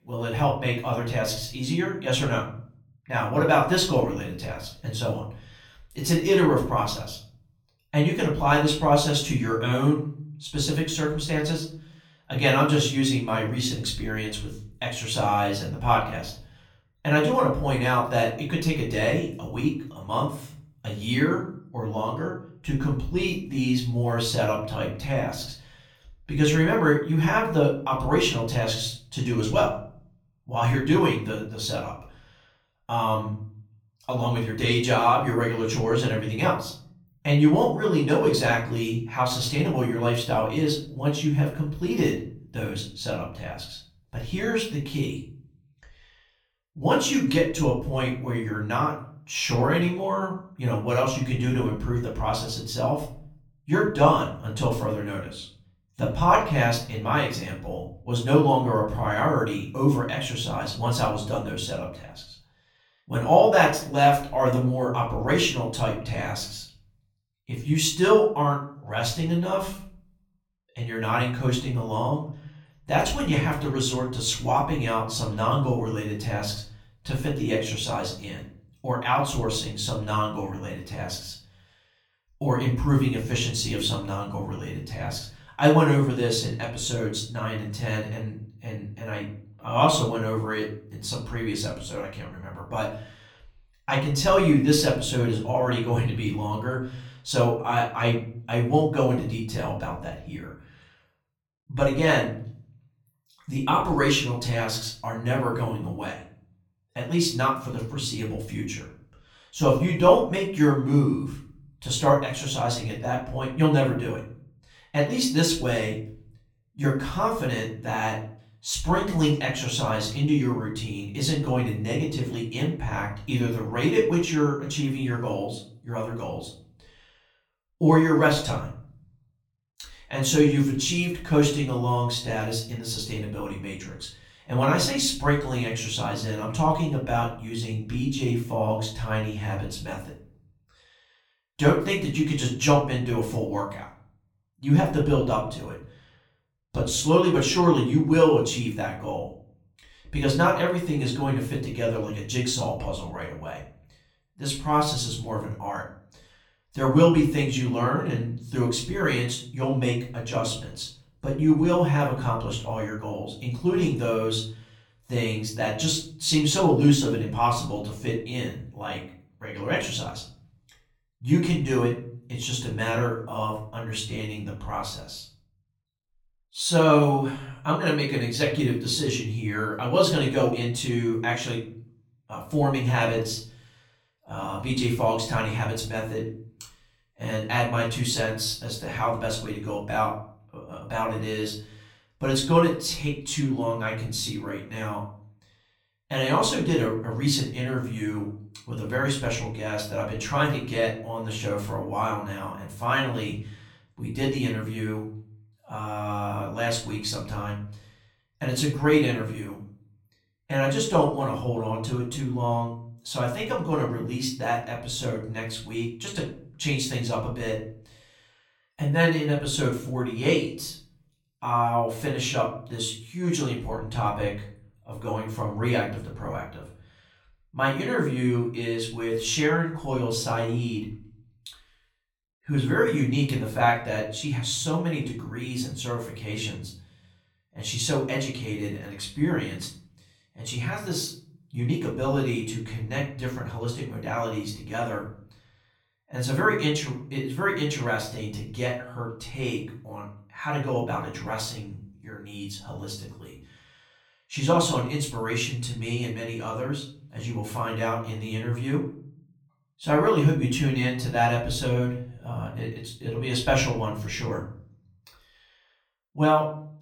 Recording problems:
off-mic speech; far
room echo; slight; dies away in 0.5 s

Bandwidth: 18 kHz